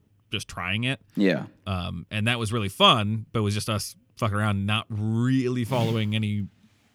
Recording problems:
none

